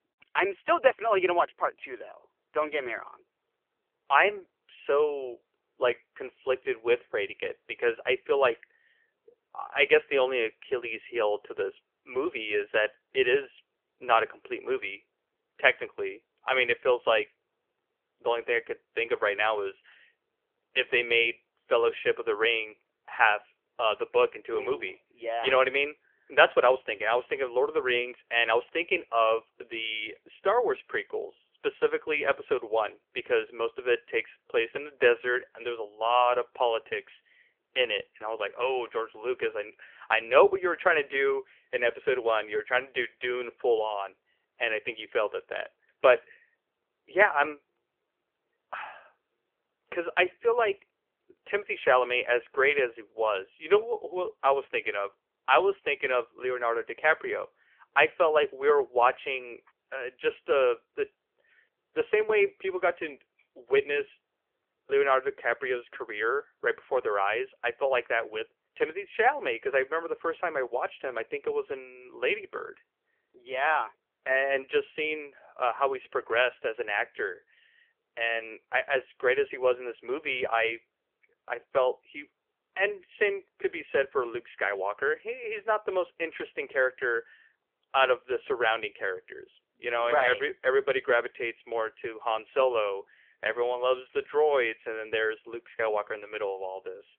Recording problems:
phone-call audio; nothing above 3 kHz

